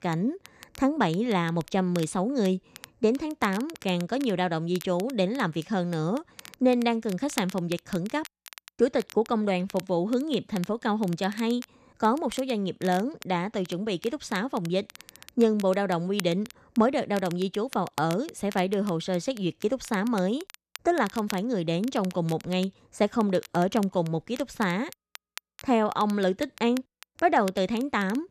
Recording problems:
crackle, like an old record; noticeable; 20 dB below the speech

